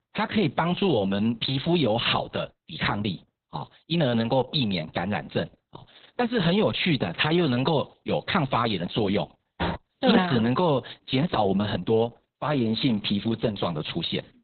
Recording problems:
garbled, watery; badly; nothing above 4 kHz
door banging; noticeable; at 9.5 s; peak 6 dB below the speech

